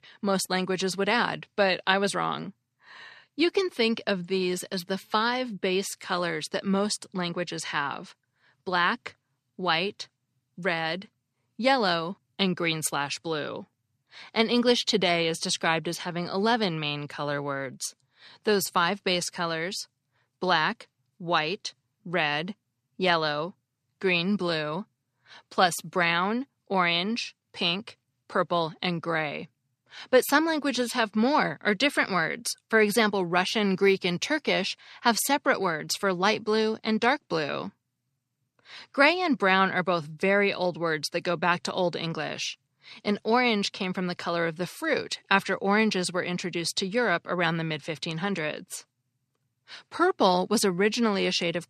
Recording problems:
none

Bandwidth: 14 kHz